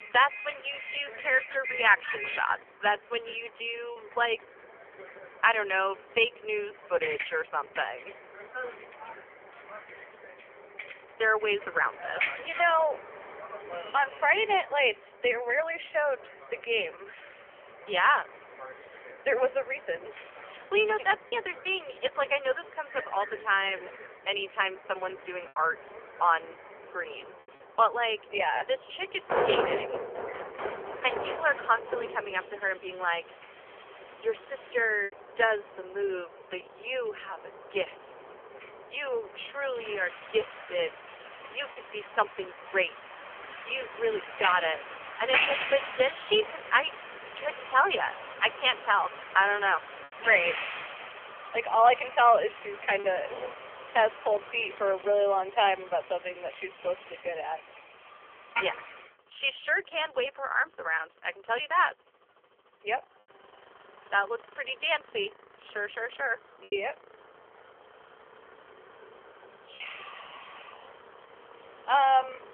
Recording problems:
phone-call audio; poor line; nothing above 3 kHz
traffic noise; loud; throughout; 10 dB below the speech
choppy; occasionally; 1% of the speech affected

